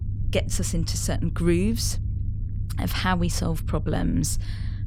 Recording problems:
low rumble; noticeable; throughout; 15 dB below the speech

